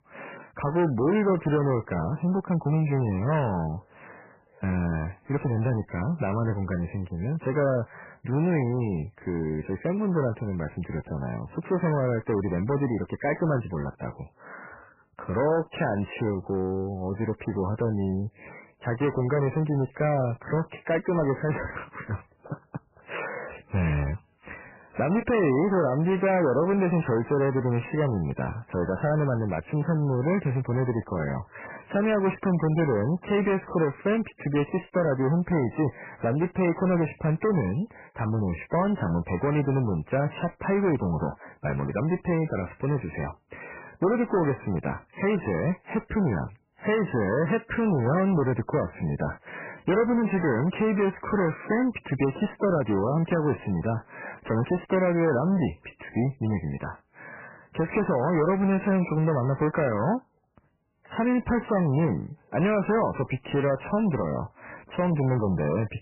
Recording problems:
garbled, watery; badly; nothing above 3 kHz
distortion; slight; 10 dB below the speech

